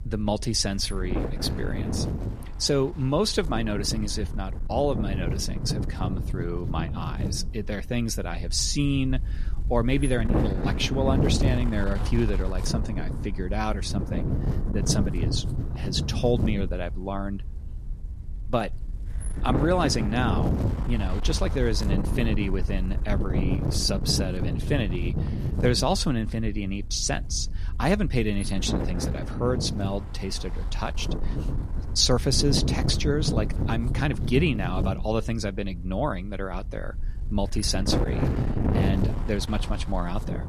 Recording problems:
wind noise on the microphone; heavy; 8 dB below the speech

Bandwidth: 14 kHz